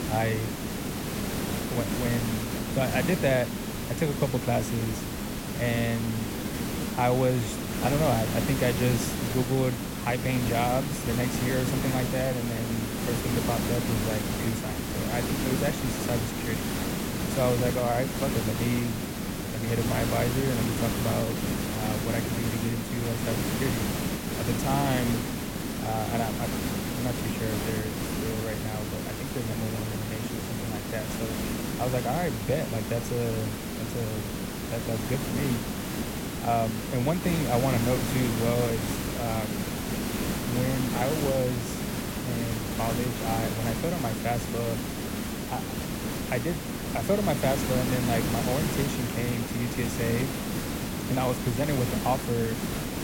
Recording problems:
hiss; loud; throughout; as loud as the speech

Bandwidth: 16.5 kHz